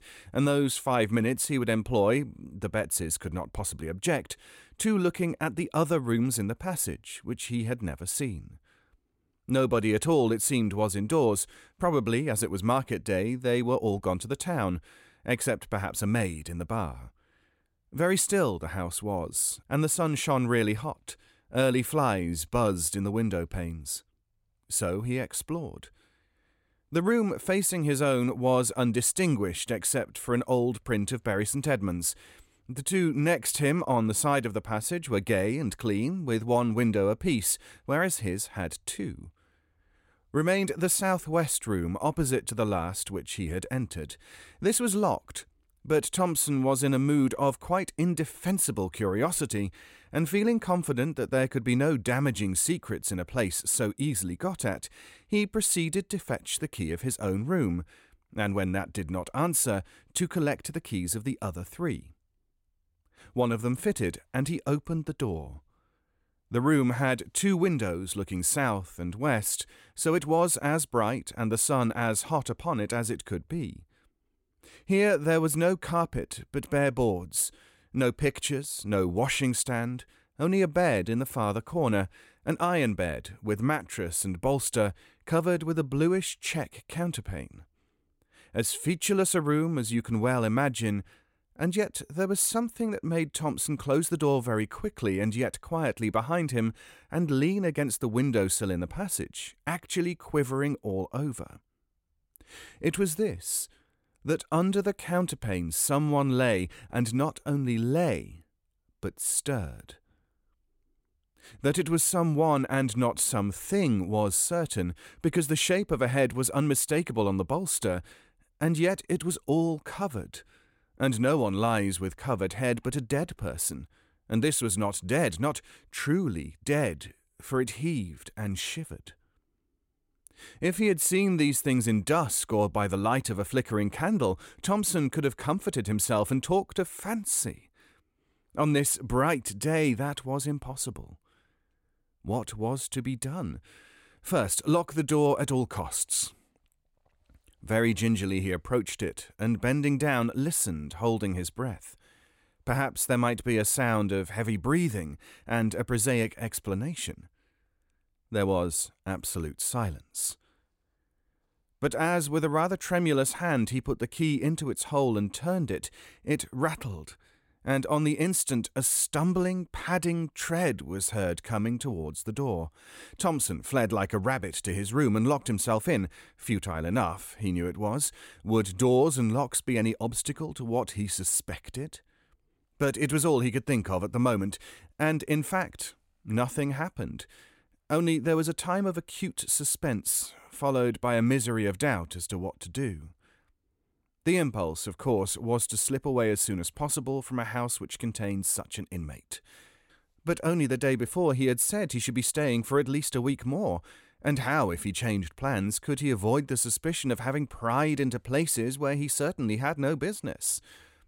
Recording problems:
none

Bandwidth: 16.5 kHz